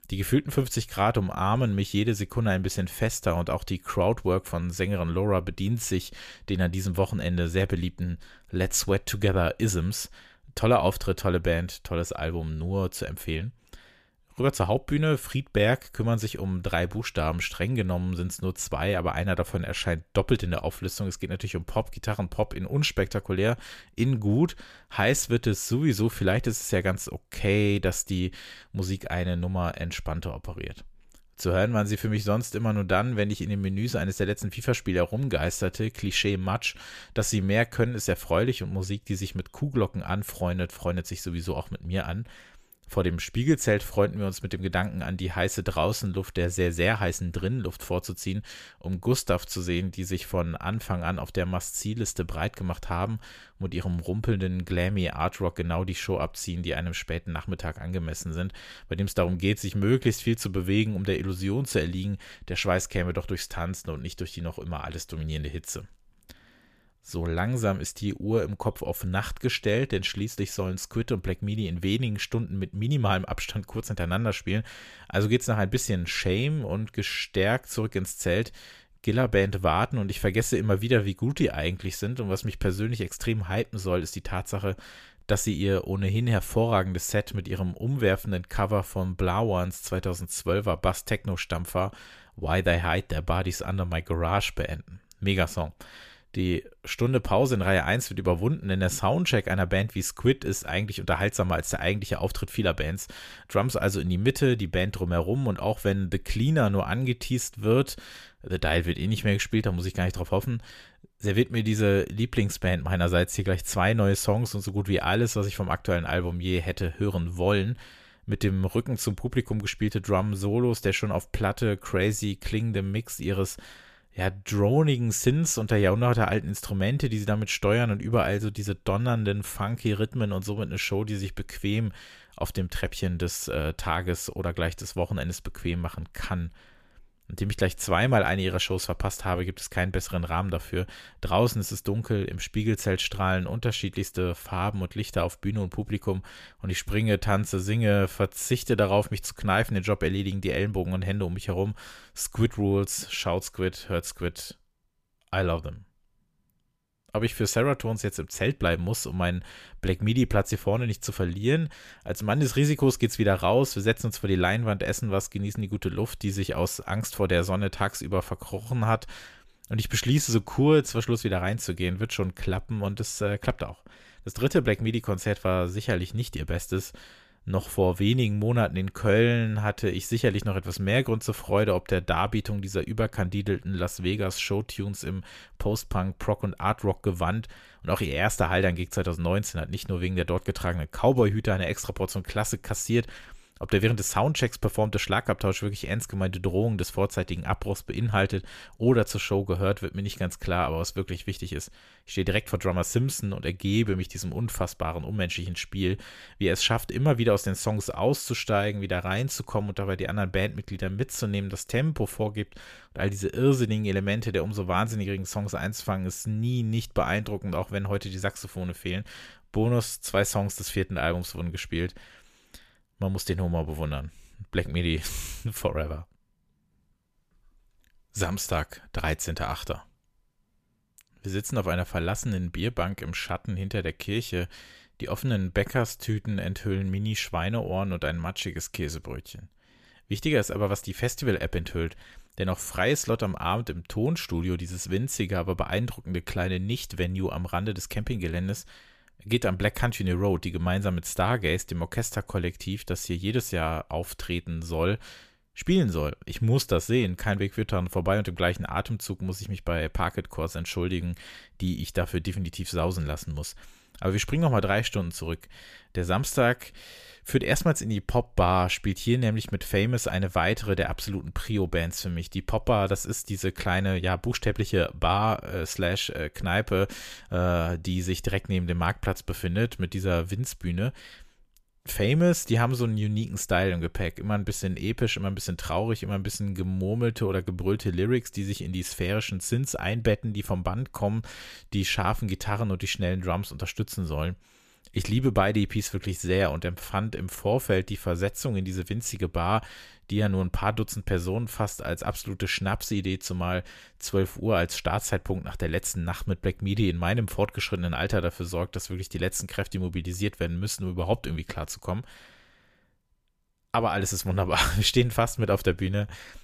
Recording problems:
none

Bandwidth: 14.5 kHz